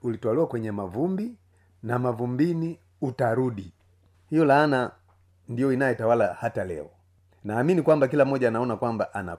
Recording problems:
none

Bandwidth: 15 kHz